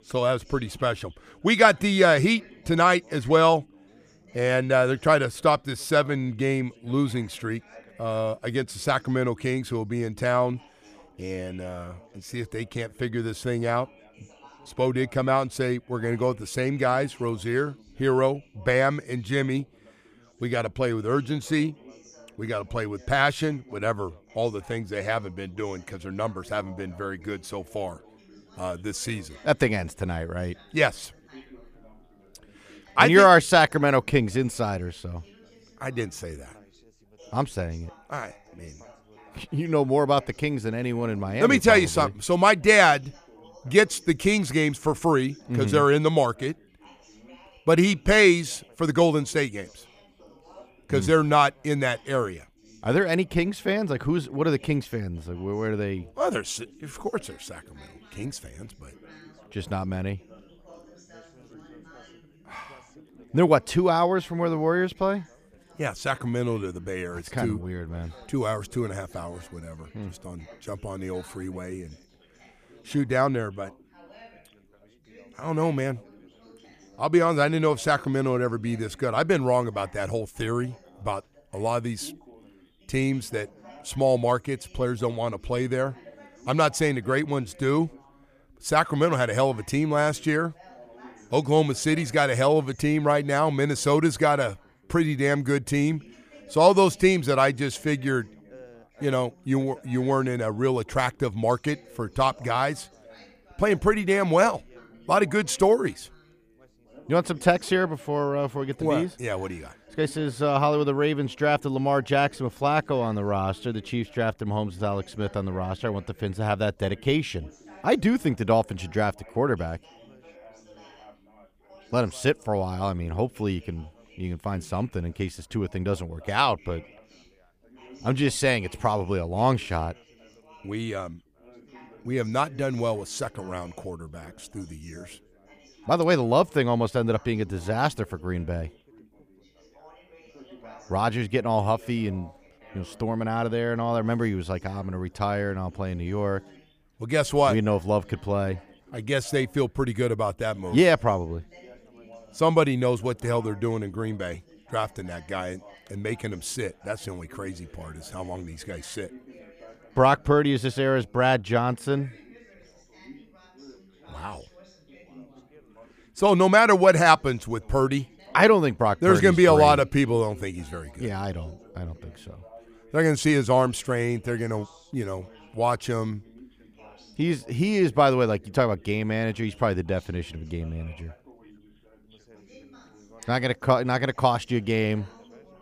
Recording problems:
background chatter; faint; throughout; 4 voices, 25 dB below the speech

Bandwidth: 15 kHz